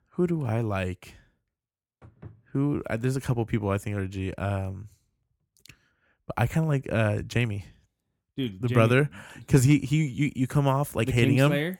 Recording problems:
none

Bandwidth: 17 kHz